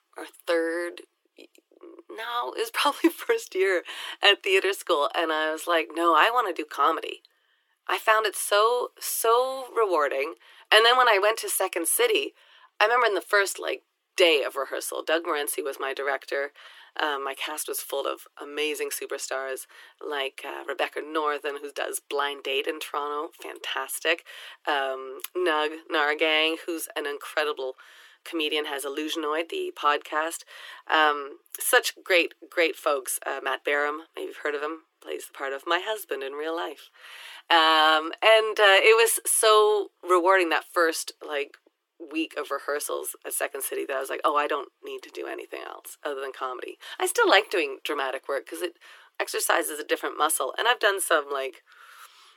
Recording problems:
thin; very; fading below 300 Hz

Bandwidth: 17 kHz